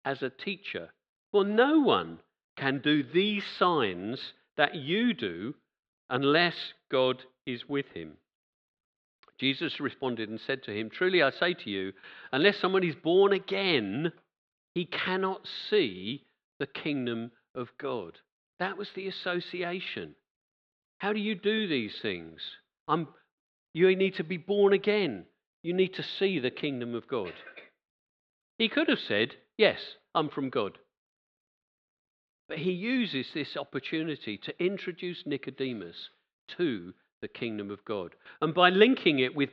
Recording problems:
muffled; very slightly; fading above 4 kHz

